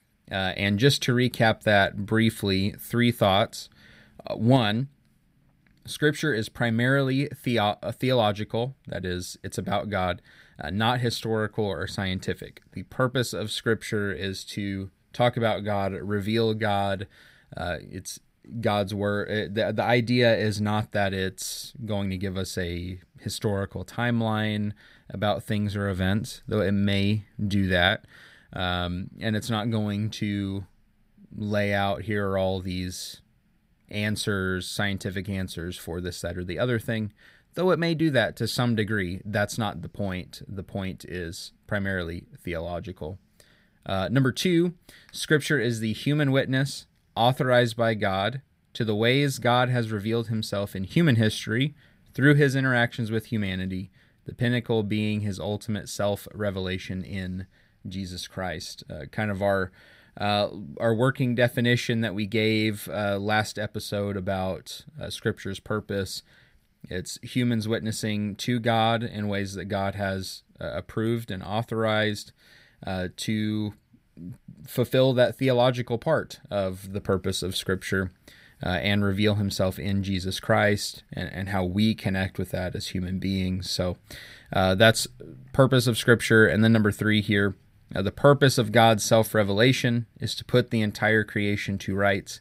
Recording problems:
none

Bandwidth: 15.5 kHz